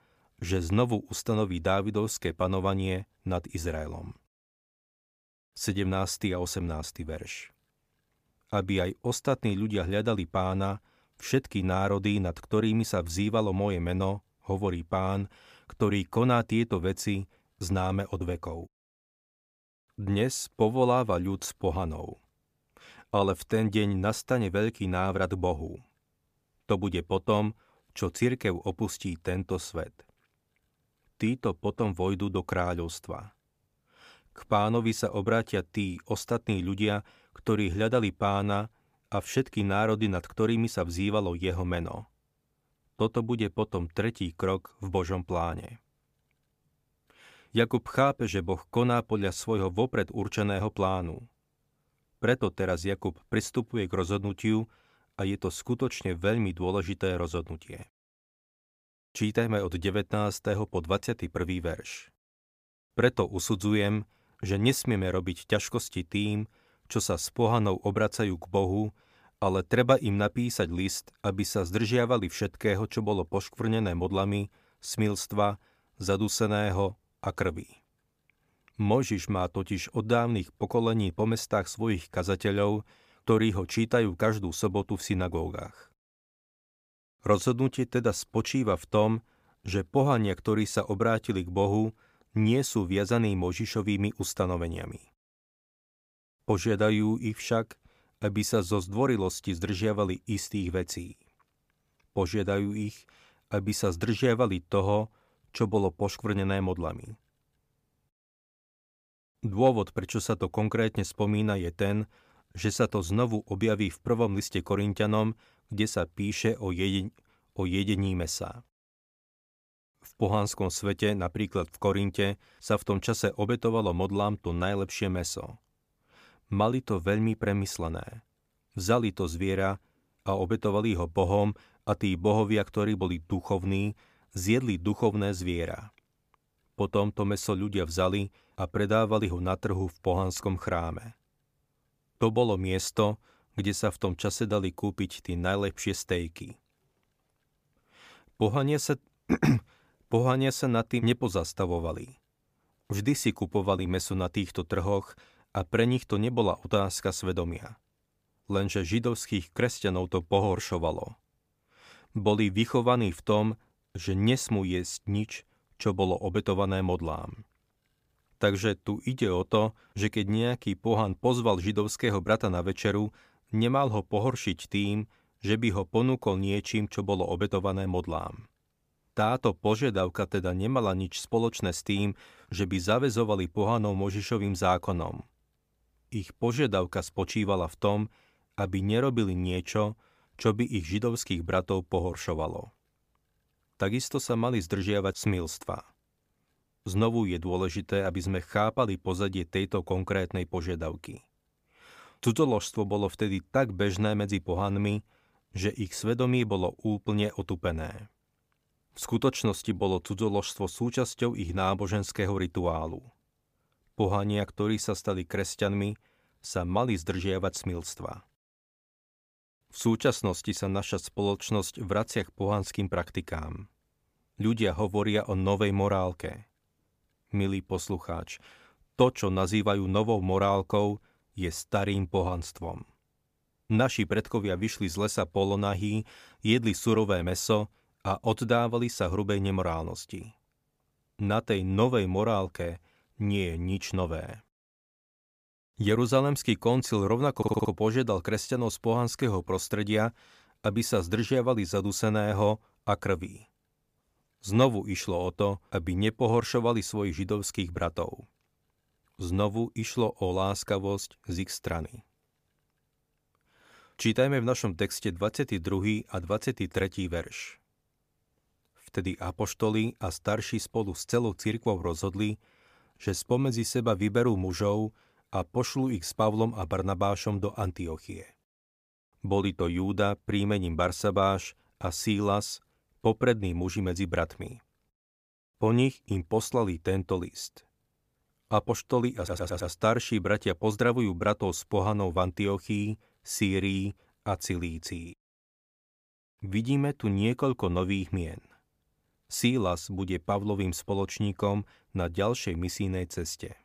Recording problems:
audio stuttering; at 4:07 and at 4:49

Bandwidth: 15 kHz